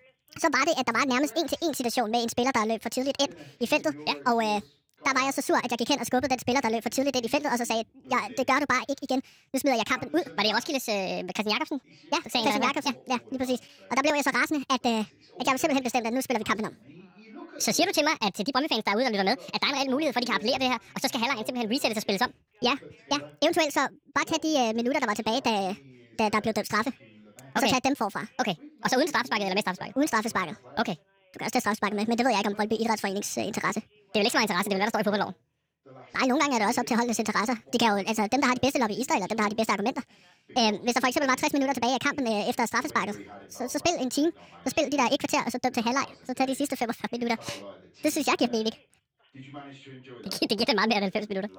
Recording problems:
wrong speed and pitch; too fast and too high; 1.6 times normal speed
background chatter; faint; throughout; 2 voices, 25 dB below the speech

